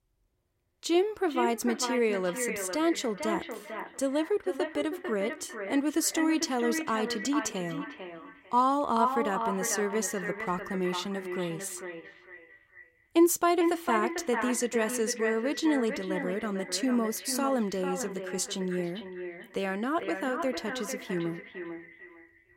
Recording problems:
echo of what is said; strong; throughout; 450 ms later, 7 dB below the speech

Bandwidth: 16 kHz